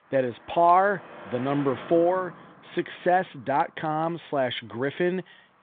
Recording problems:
phone-call audio
traffic noise; noticeable; throughout; 20 dB below the speech

